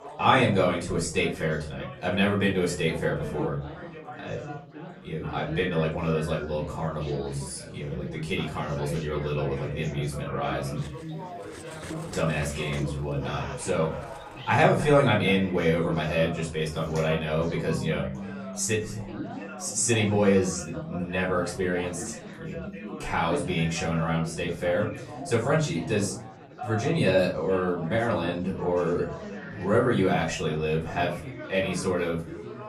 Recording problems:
off-mic speech; far
room echo; slight; dies away in 0.4 s
background music; noticeable; from 12 s on; 20 dB below the speech
chatter from many people; noticeable; throughout; 10 dB below the speech
clattering dishes; faint; from 11 to 14 s; peak 15 dB below the speech

